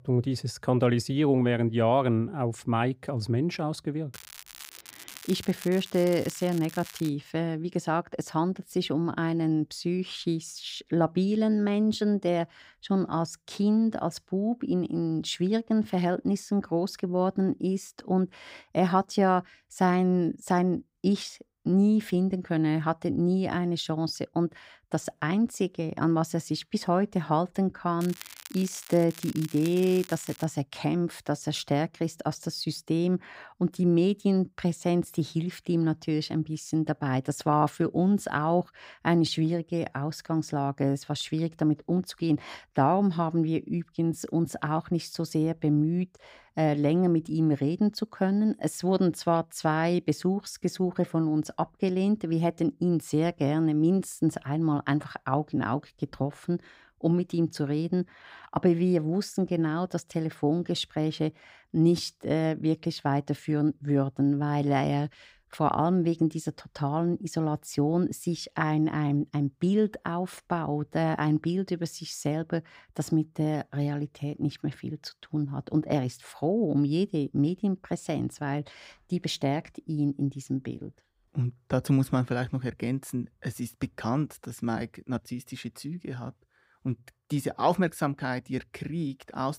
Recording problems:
crackling; noticeable; from 4 to 7 s and from 28 to 30 s; 15 dB below the speech

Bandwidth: 15.5 kHz